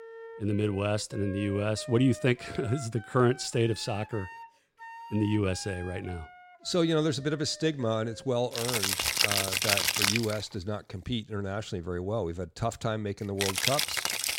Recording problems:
background music; very loud; throughout; 3 dB above the speech

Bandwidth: 16.5 kHz